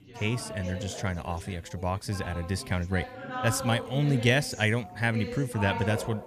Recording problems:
background chatter; loud; throughout; 4 voices, 9 dB below the speech

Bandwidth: 14.5 kHz